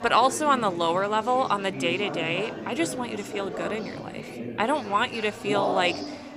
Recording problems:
chatter from many people; loud; throughout; 8 dB below the speech

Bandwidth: 15.5 kHz